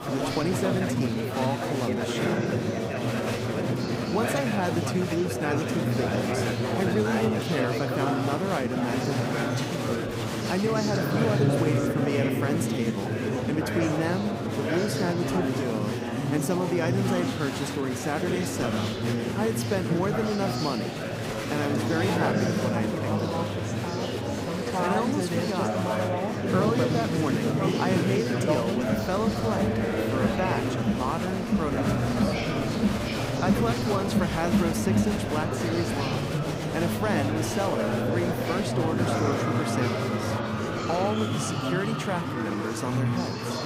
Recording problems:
murmuring crowd; very loud; throughout; 3 dB above the speech

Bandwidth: 15.5 kHz